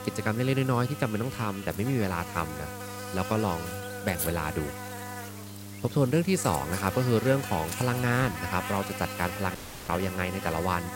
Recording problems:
electrical hum; loud; throughout; 50 Hz, 7 dB below the speech
audio cutting out; at 9.5 s

